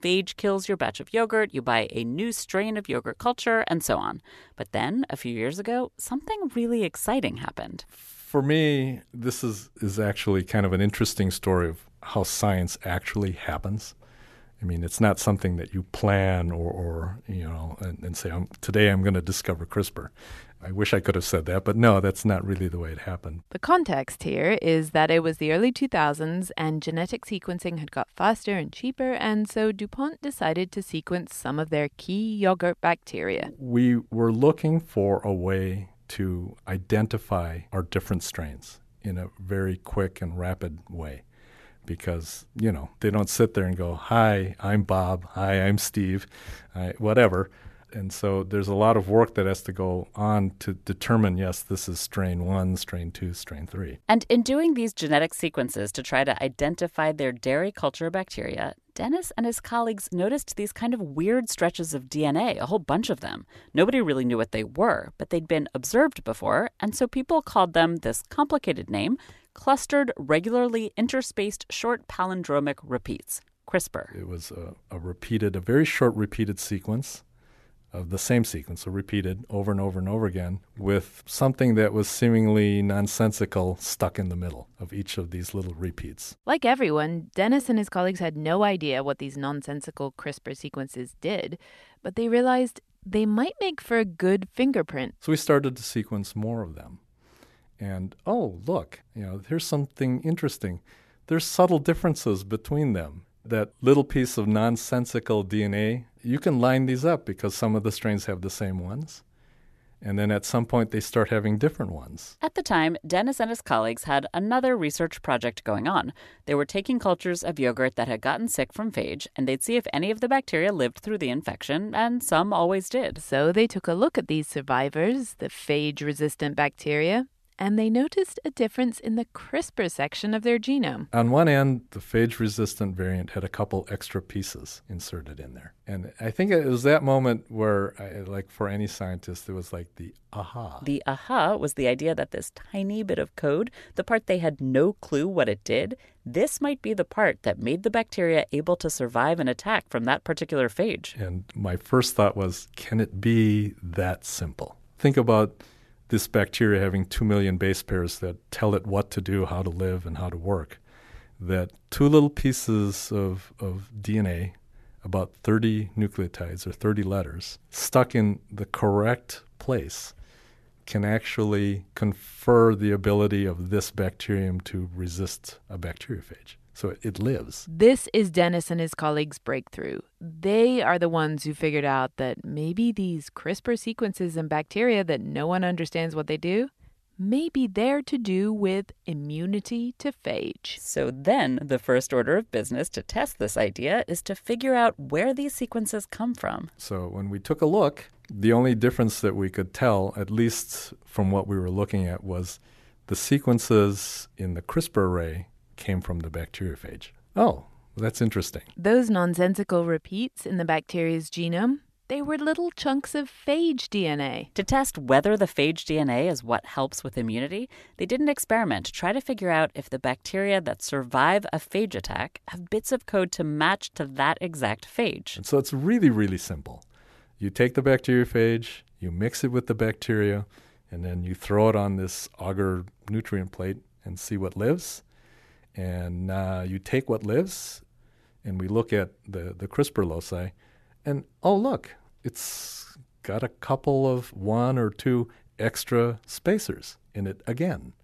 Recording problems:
none

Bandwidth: 13.5 kHz